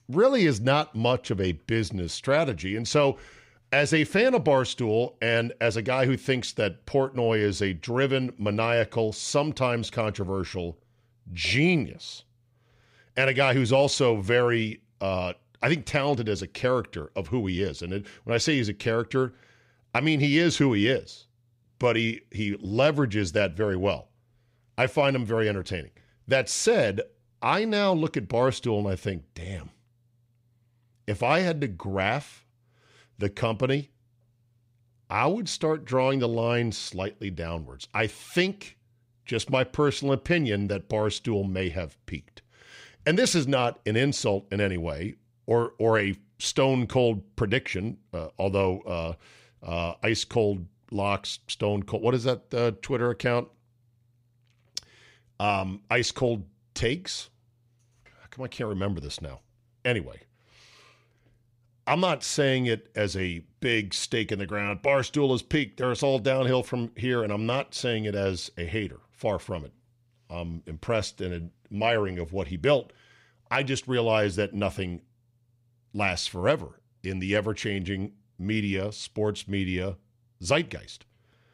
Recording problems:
none

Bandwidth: 15.5 kHz